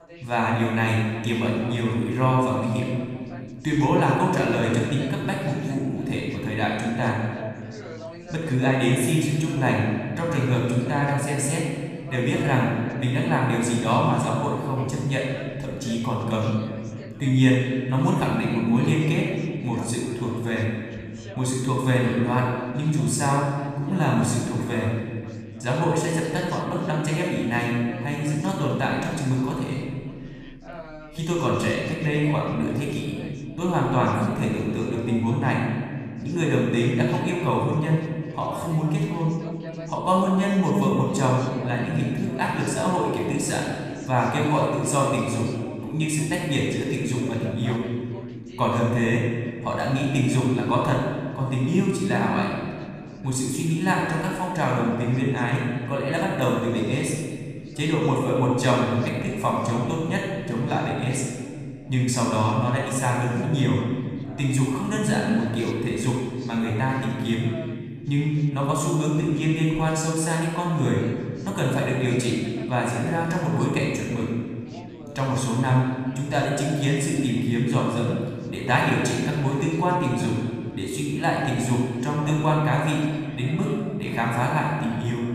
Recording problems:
off-mic speech; far
room echo; noticeable; dies away in 1.8 s
background chatter; faint; throughout; 3 voices, 20 dB below the speech

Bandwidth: 15 kHz